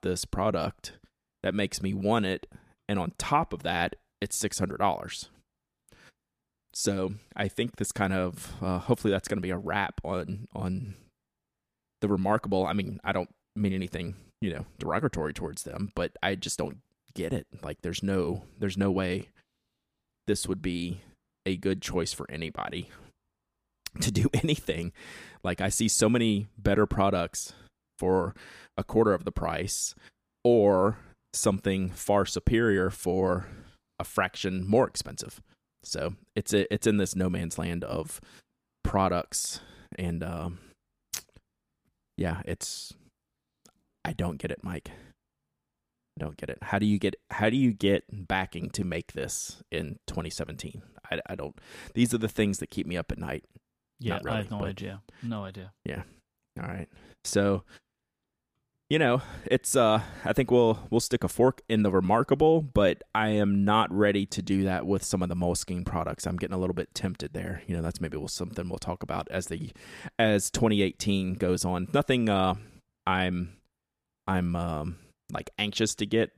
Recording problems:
none

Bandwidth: 15 kHz